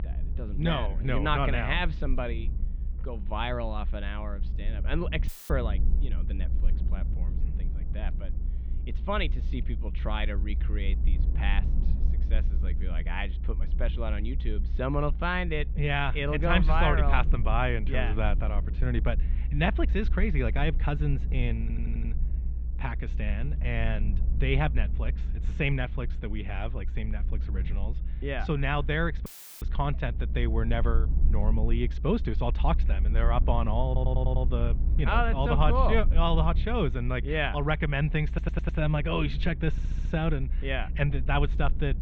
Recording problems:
muffled; very; fading above 3 kHz
low rumble; noticeable; throughout; 20 dB below the speech
audio cutting out; filled with static; at 5.5 s and at 29 s
audio stuttering; 4 times, first at 22 s

